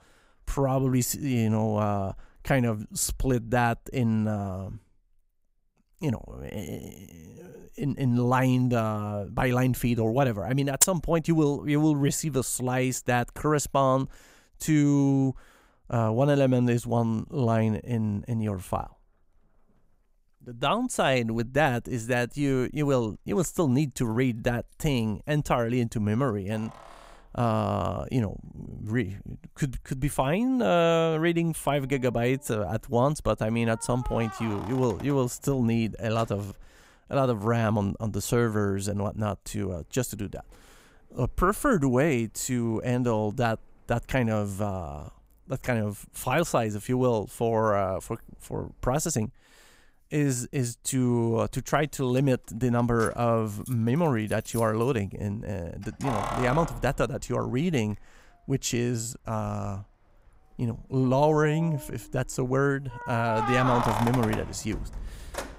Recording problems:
household noises; loud; throughout; 10 dB below the speech

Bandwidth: 15.5 kHz